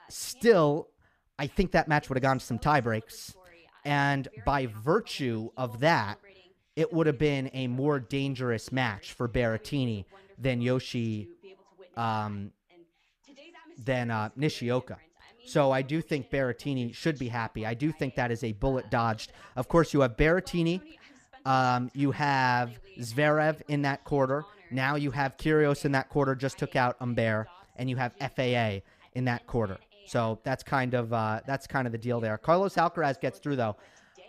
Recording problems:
voice in the background; faint; throughout; 25 dB below the speech

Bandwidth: 14.5 kHz